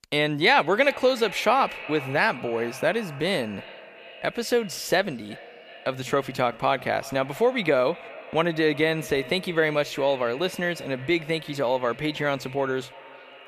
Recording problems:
echo of what is said; noticeable; throughout; 360 ms later, 15 dB below the speech

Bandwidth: 14.5 kHz